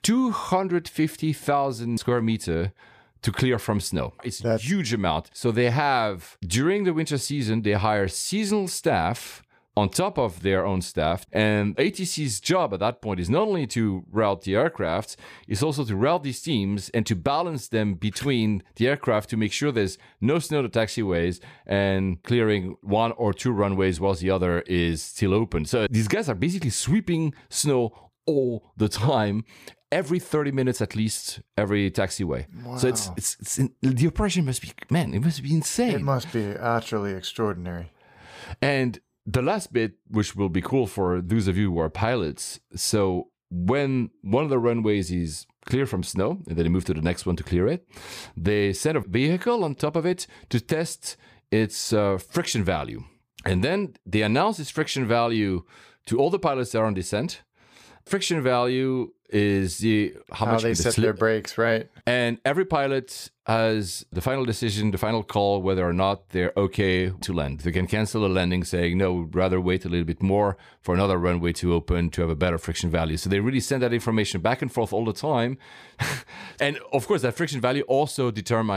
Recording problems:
abrupt cut into speech; at the end

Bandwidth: 15 kHz